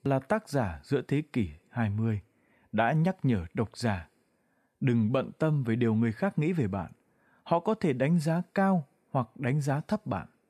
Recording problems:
none

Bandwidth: 14.5 kHz